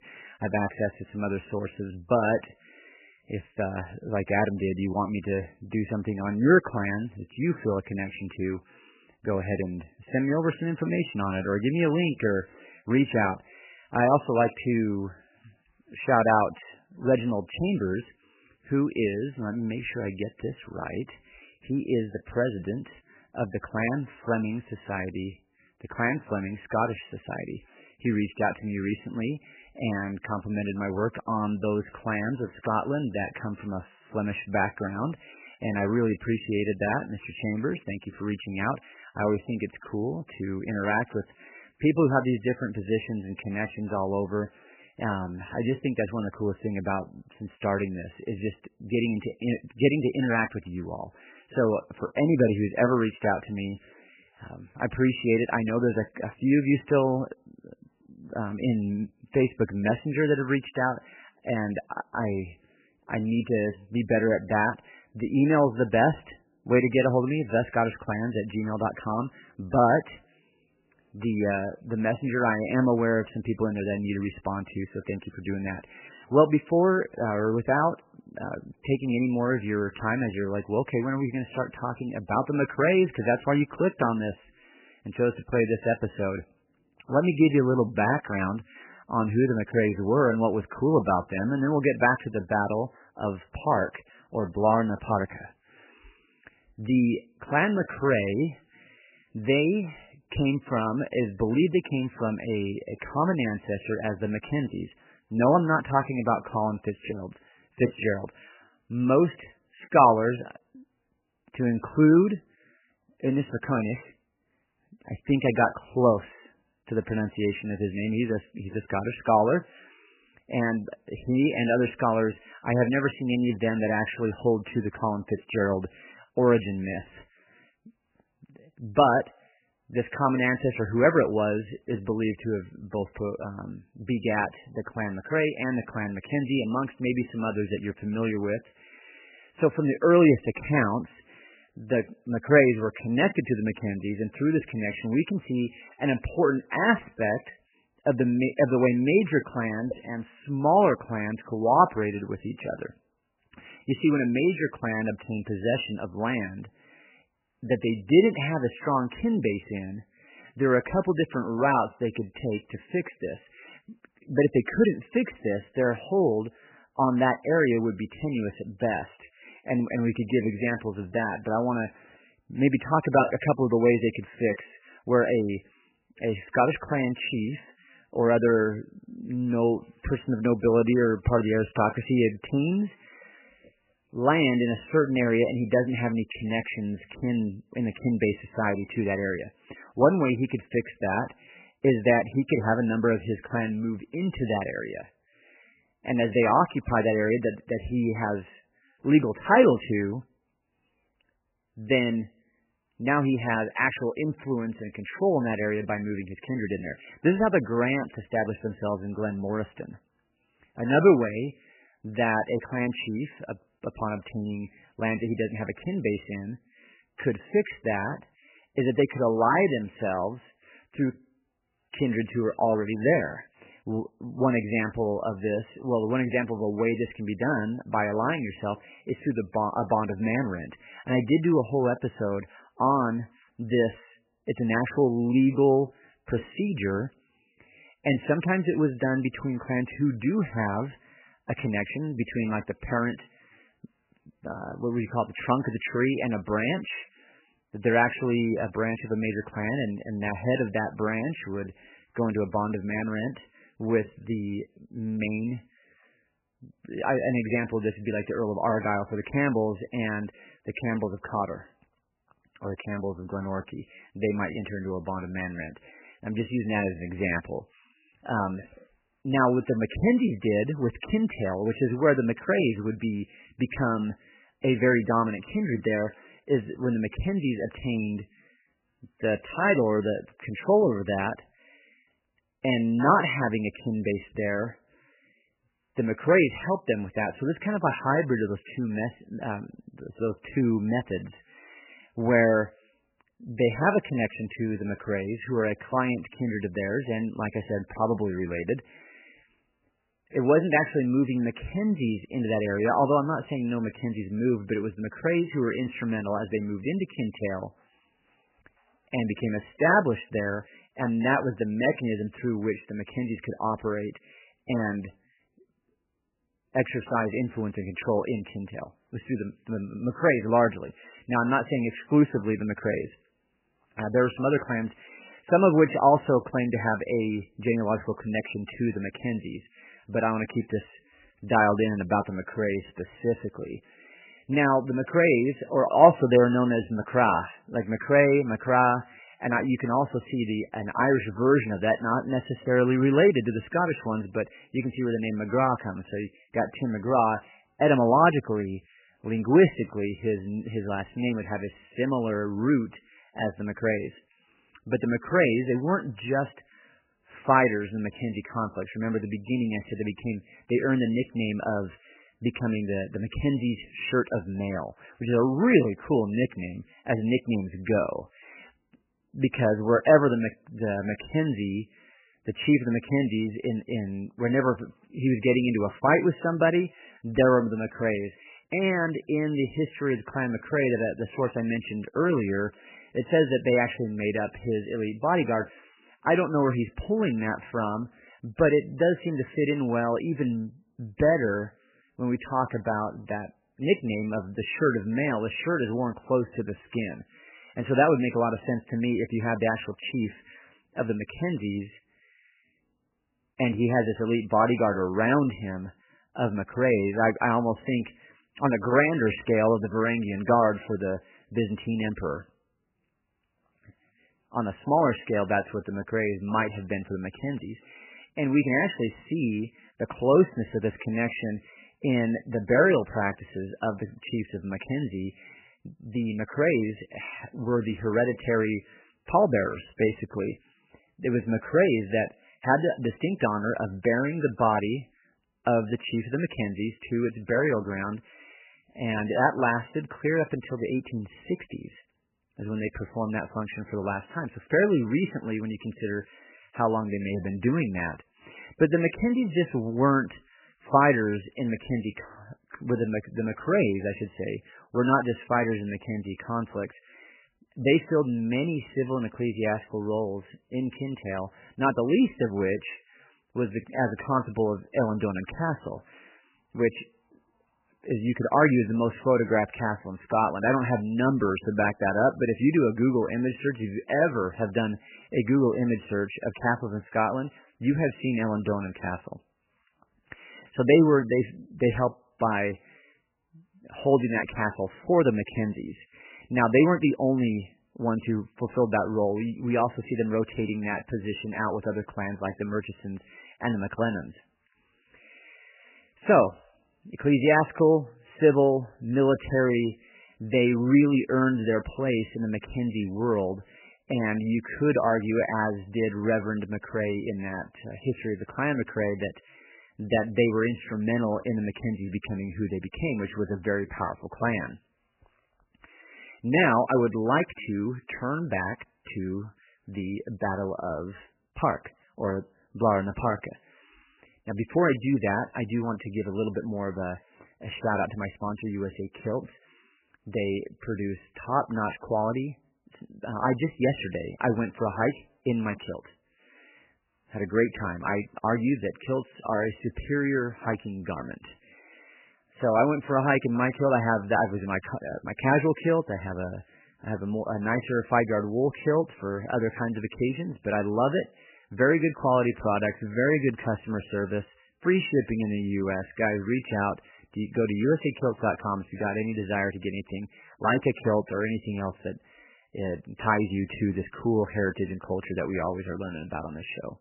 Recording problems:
garbled, watery; badly; nothing above 3 kHz

